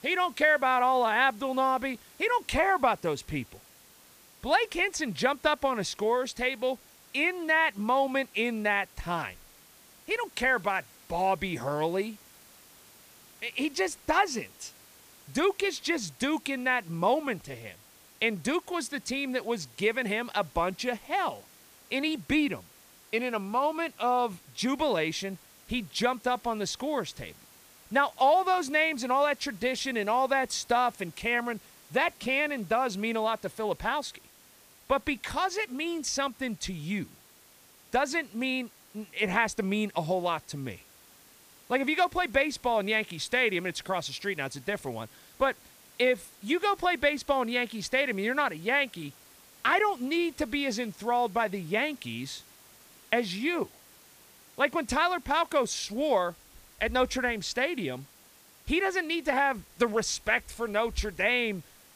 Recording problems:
hiss; faint; throughout; 25 dB below the speech

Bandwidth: 15 kHz